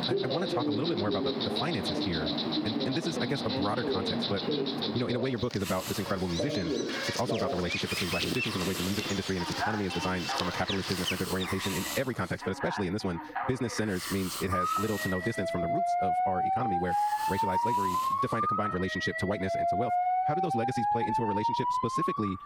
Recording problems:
wrong speed, natural pitch; too fast; 1.6 times normal speed
squashed, flat; somewhat
alarms or sirens; very loud; throughout; 1 dB above the speech
animal sounds; loud; until 12 s; 1 dB below the speech
hiss; loud; from 5.5 to 19 s; 6 dB below the speech

